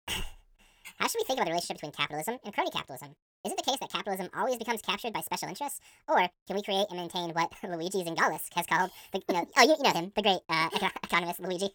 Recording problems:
wrong speed and pitch; too fast and too high; 1.6 times normal speed

